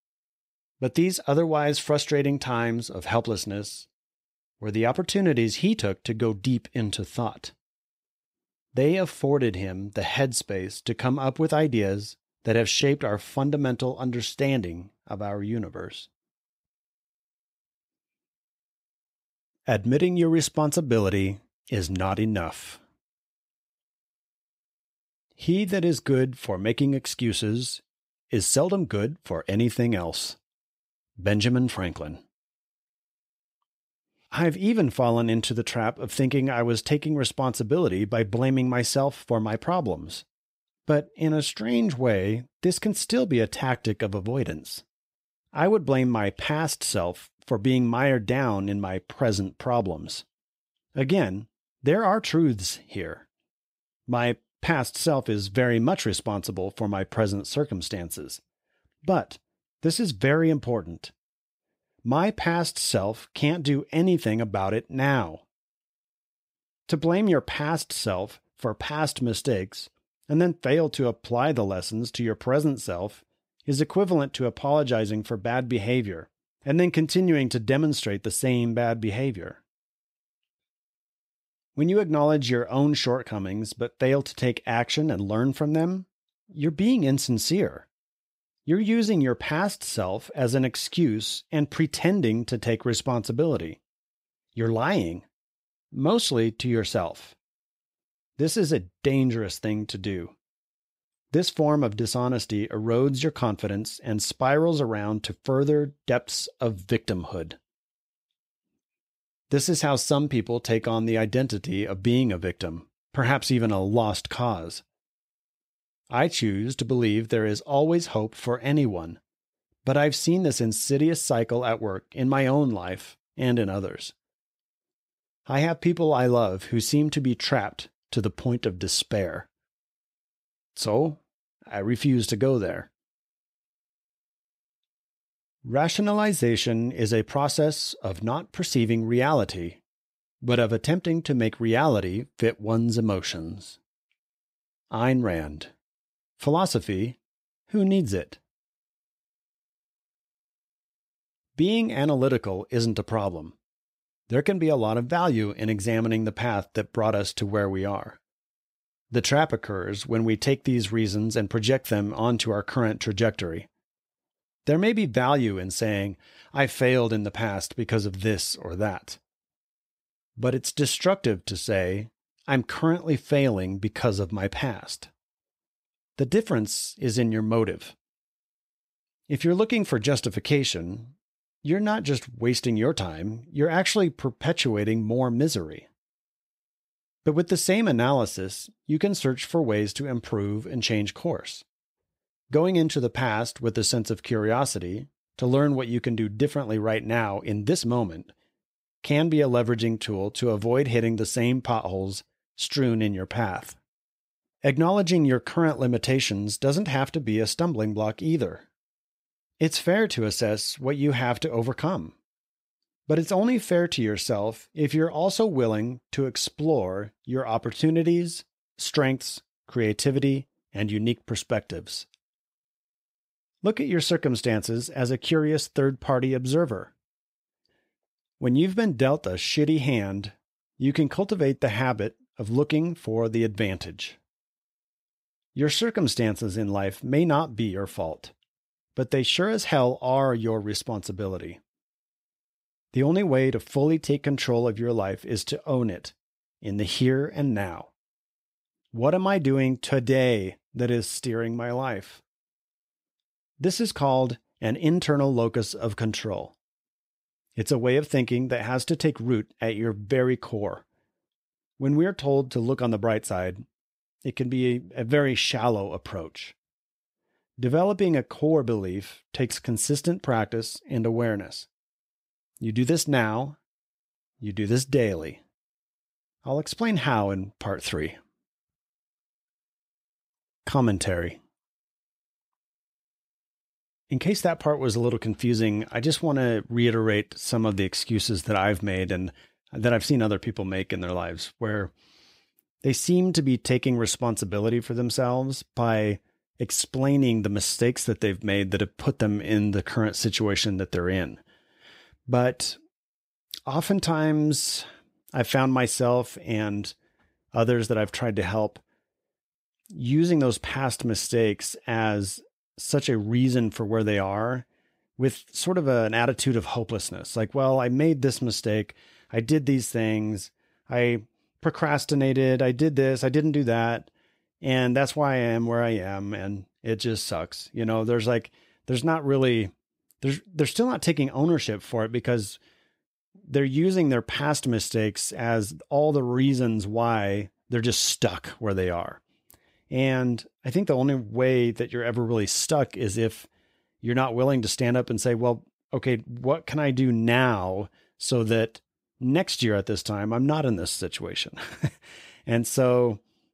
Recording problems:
uneven, jittery; slightly; from 13 s to 4:46

